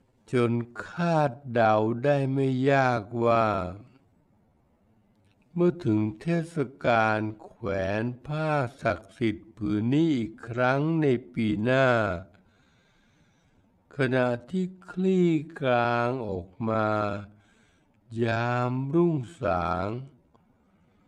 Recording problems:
wrong speed, natural pitch; too slow; 0.6 times normal speed

